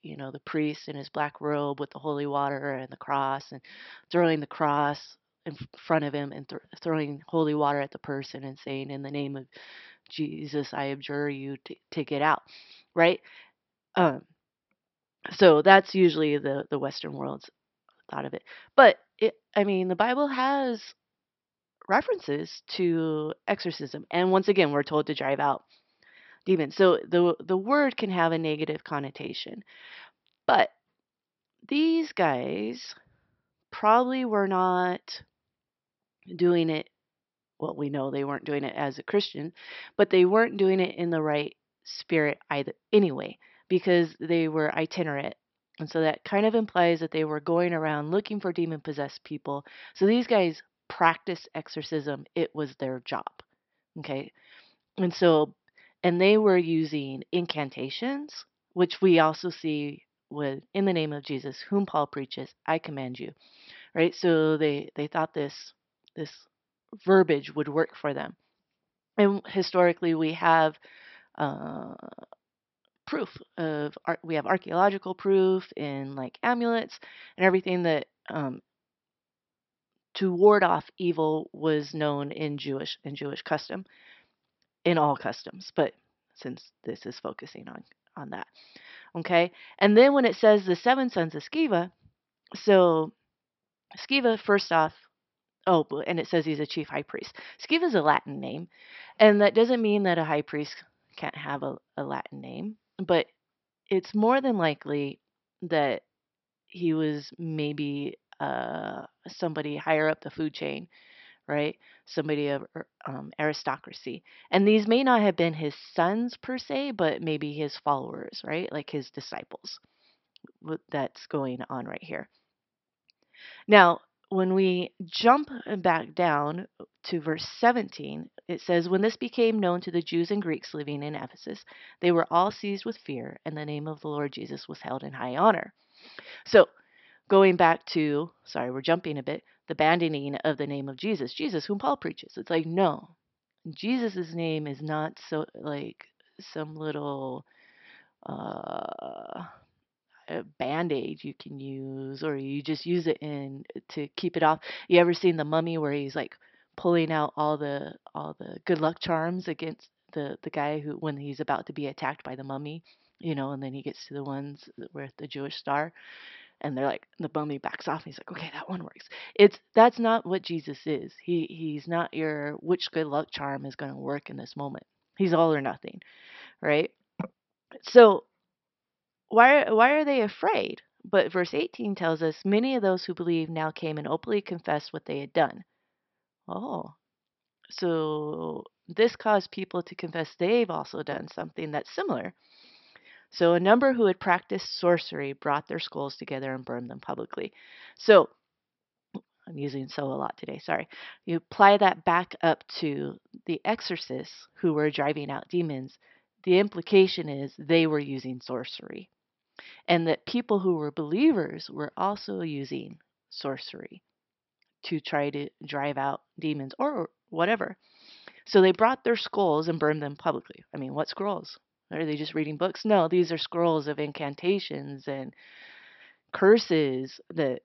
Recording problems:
high frequencies cut off; noticeable; nothing above 5.5 kHz

